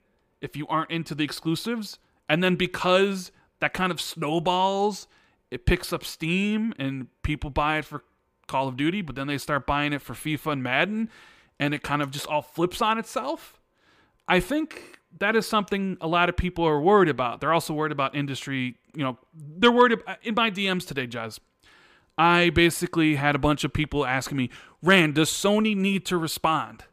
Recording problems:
none

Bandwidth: 15 kHz